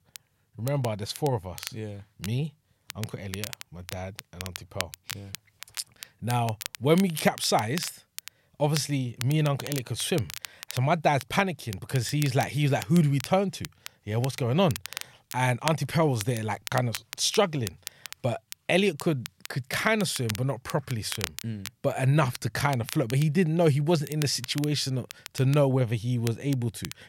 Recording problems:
crackle, like an old record; noticeable; 15 dB below the speech

